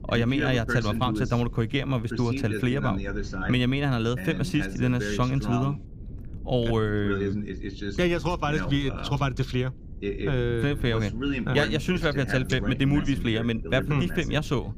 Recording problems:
voice in the background; loud; throughout; 7 dB below the speech
low rumble; faint; throughout; 20 dB below the speech

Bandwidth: 15 kHz